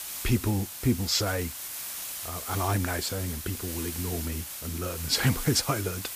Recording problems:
hiss; loud; throughout; 6 dB below the speech

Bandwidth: 15 kHz